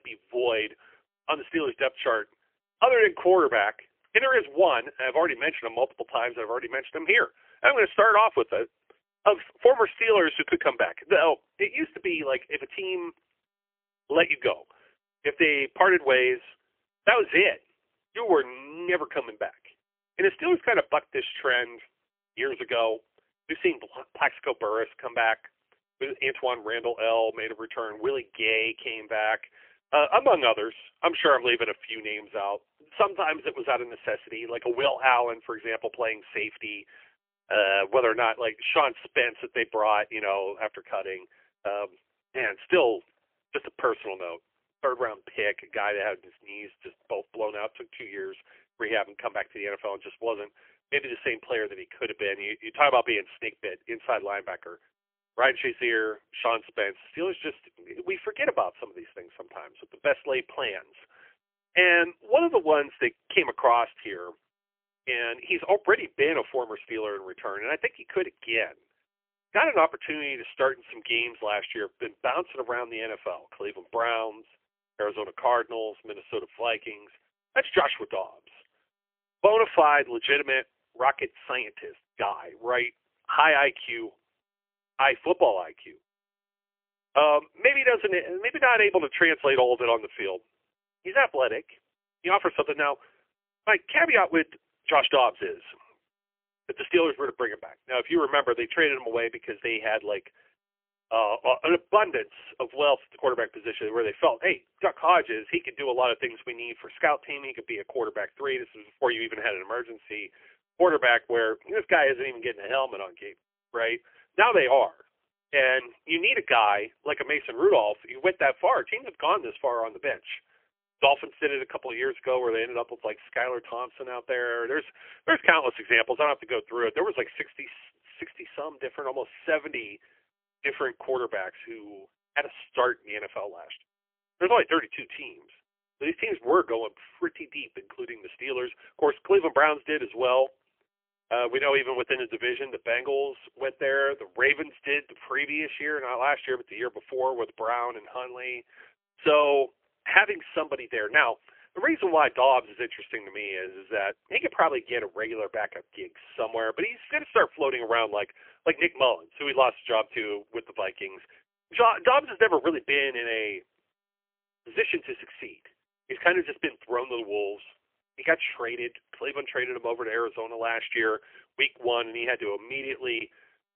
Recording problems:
phone-call audio; poor line; nothing above 3 kHz

